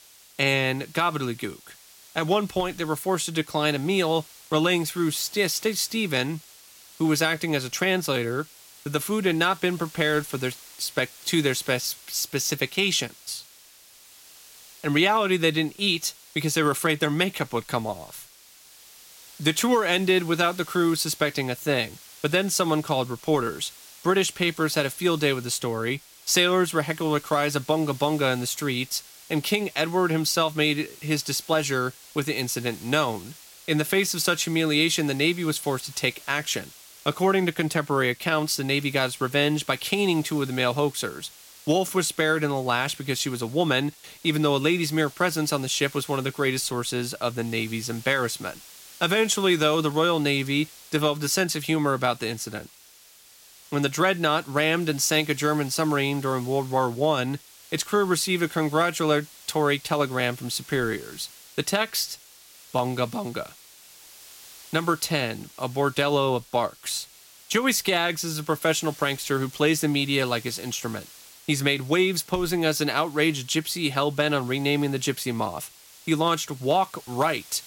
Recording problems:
hiss; faint; throughout; 20 dB below the speech

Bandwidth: 16.5 kHz